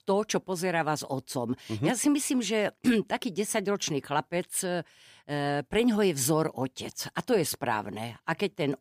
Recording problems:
none

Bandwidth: 15 kHz